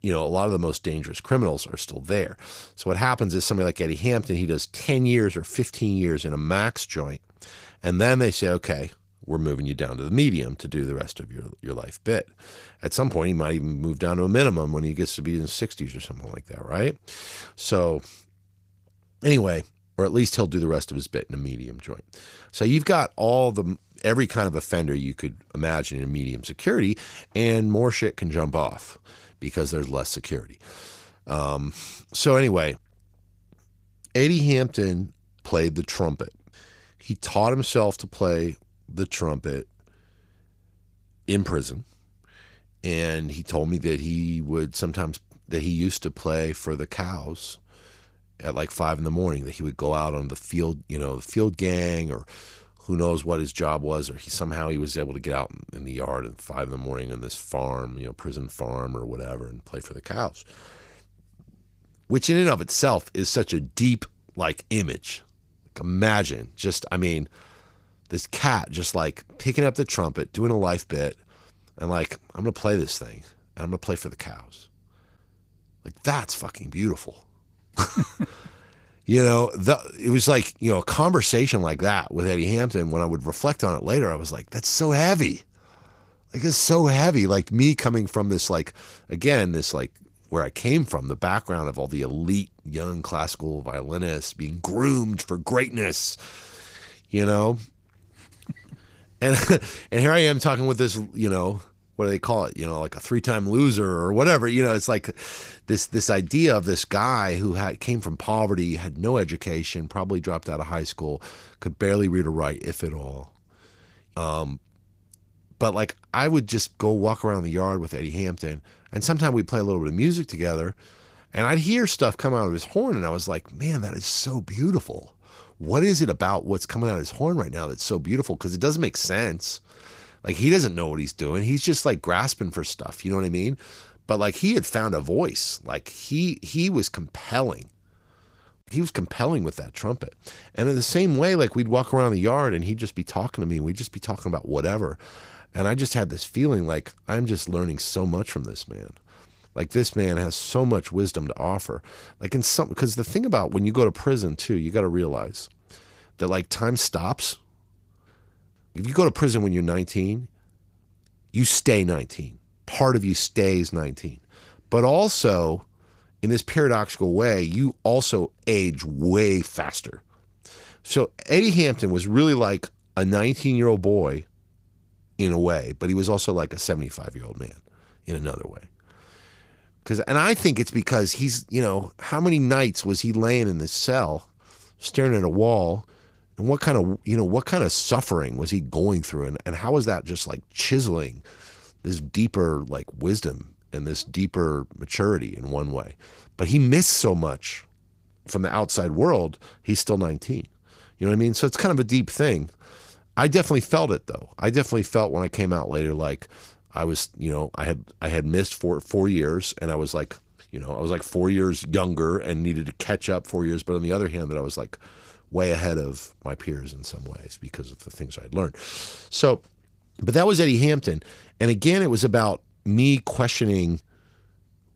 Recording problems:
garbled, watery; slightly; nothing above 15.5 kHz

